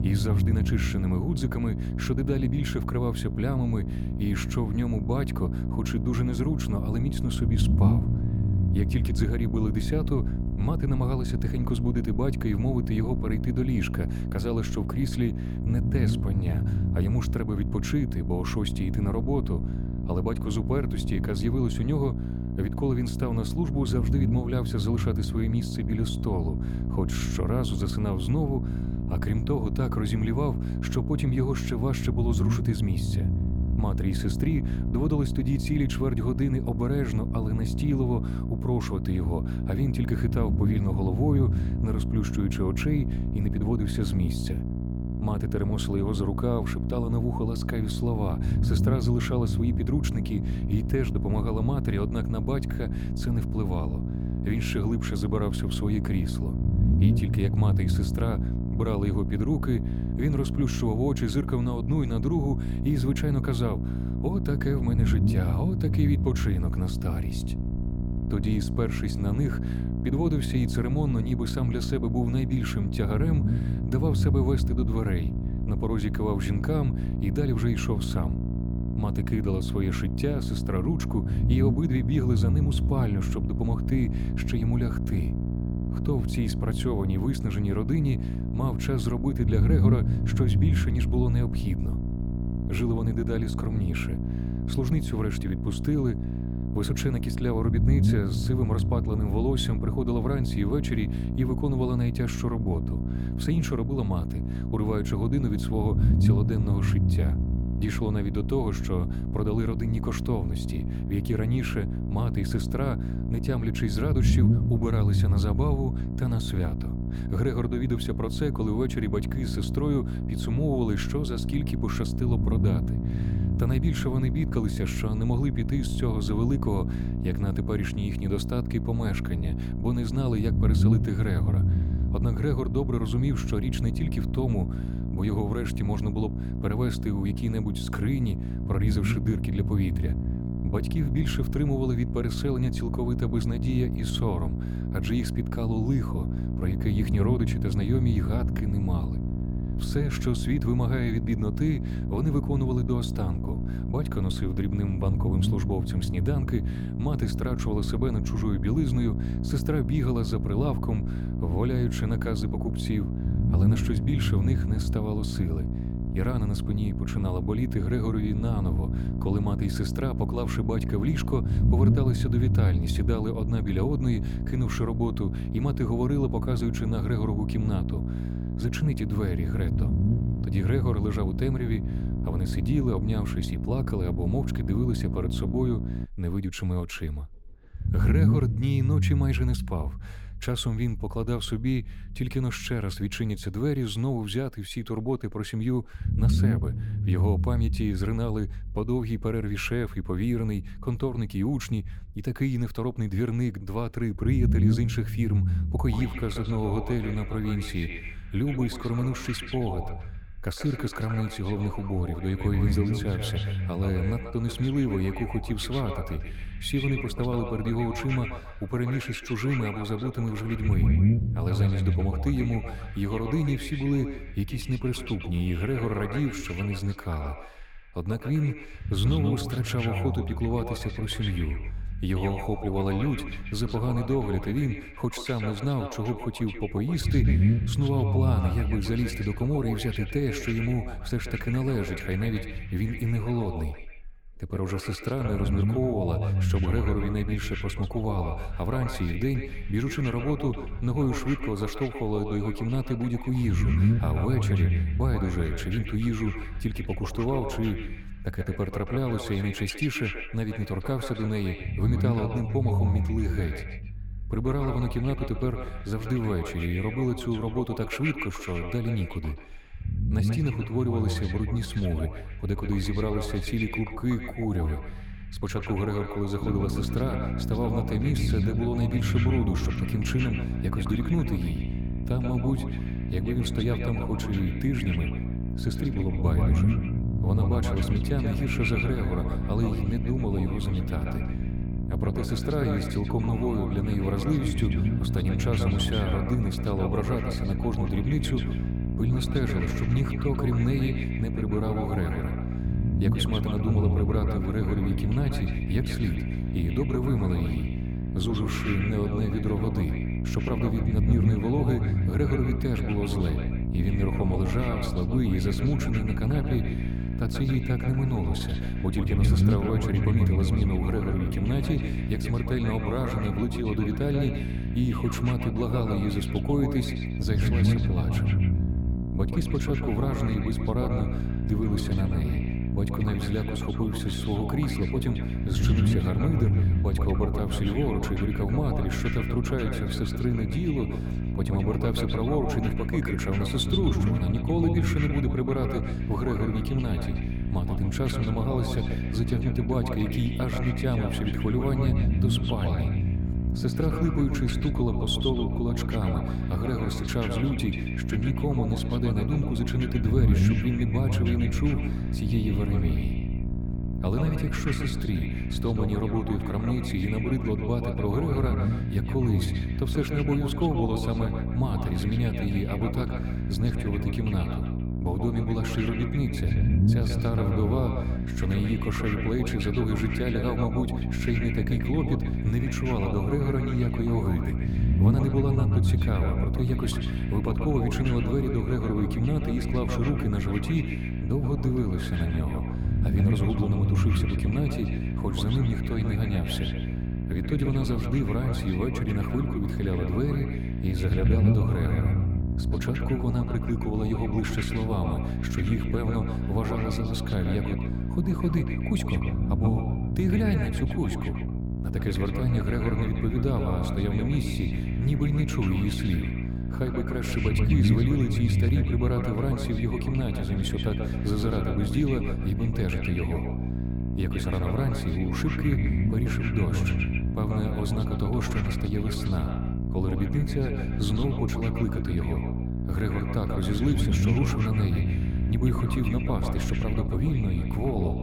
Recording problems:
echo of what is said; strong; from 3:26 on; 130 ms later, 10 dB below the speech
electrical hum; loud; until 3:06 and from 4:36 on; 60 Hz, 5 dB below the speech
low rumble; loud; throughout; 8 dB below the speech

